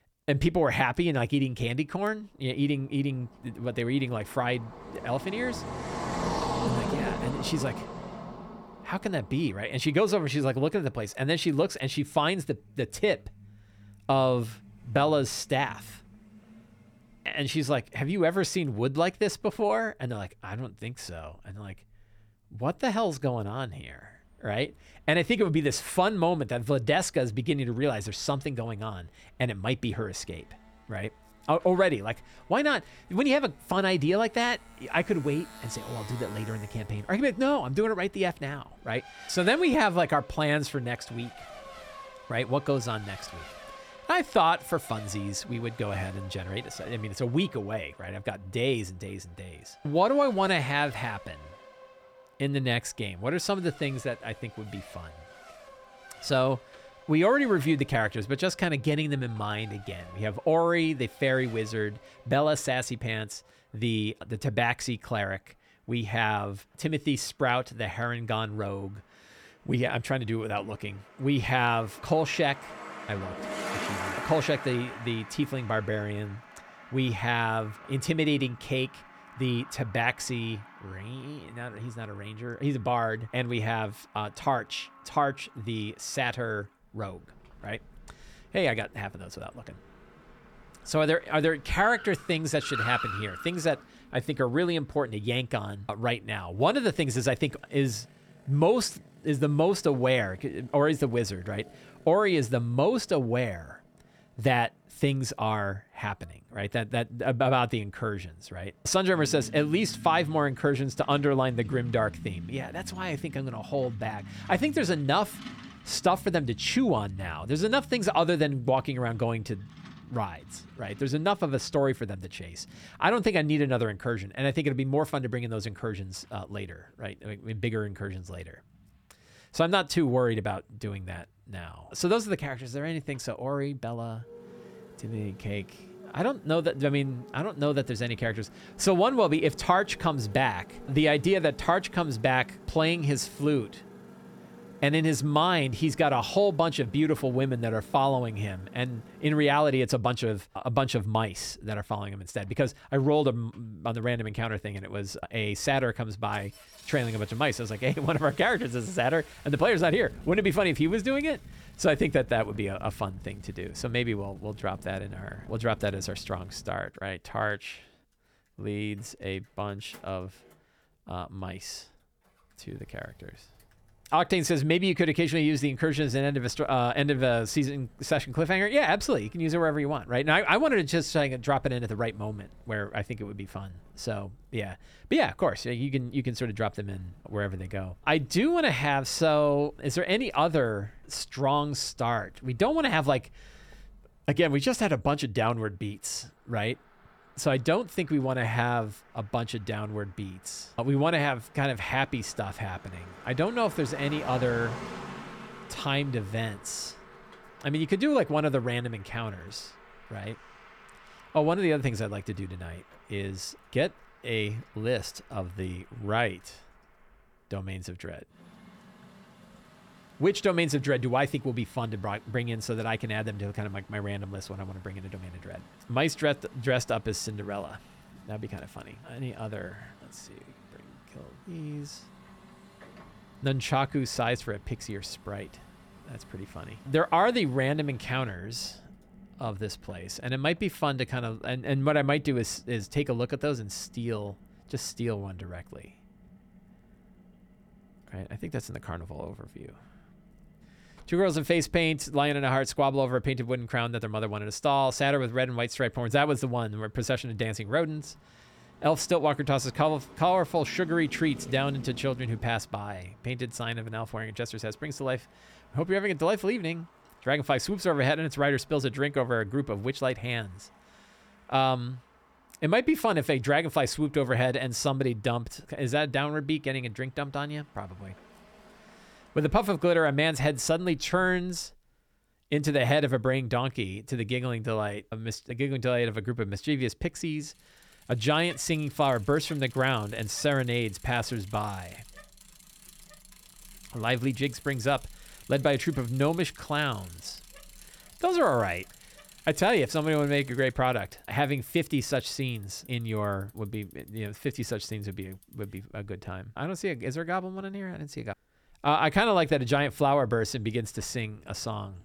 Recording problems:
traffic noise; noticeable; throughout; 20 dB below the speech

